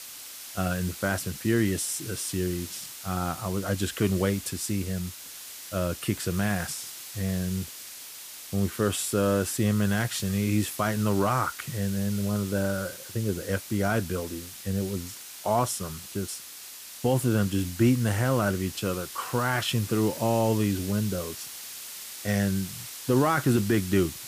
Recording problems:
hiss; noticeable; throughout; 10 dB below the speech

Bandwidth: 15 kHz